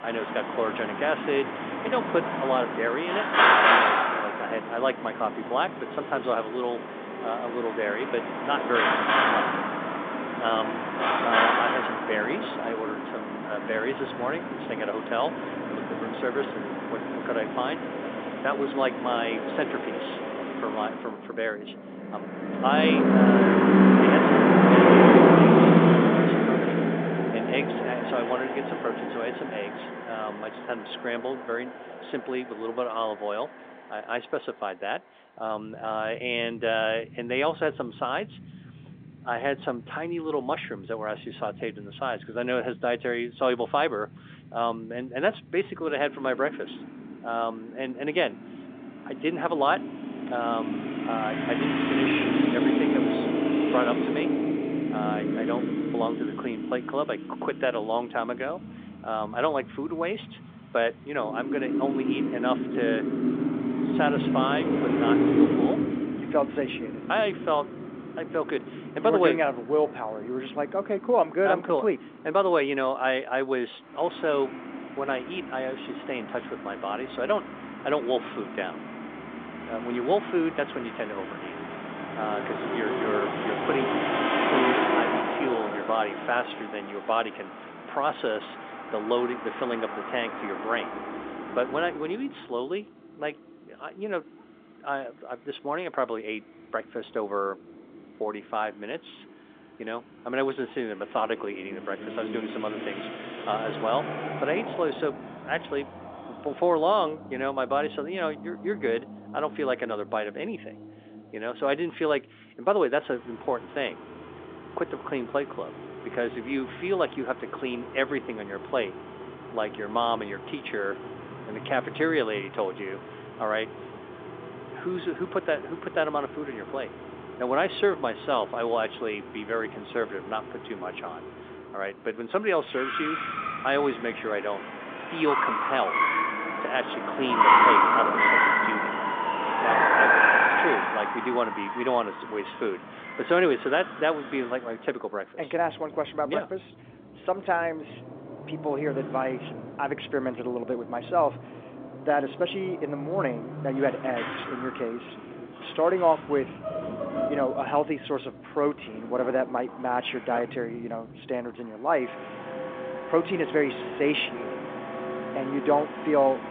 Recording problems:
phone-call audio
traffic noise; very loud; throughout; 4 dB above the speech

